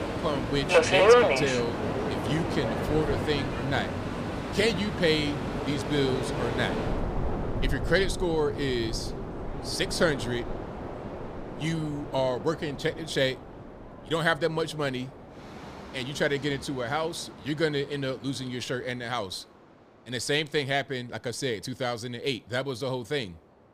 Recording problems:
train or aircraft noise; very loud; throughout; as loud as the speech

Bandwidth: 15 kHz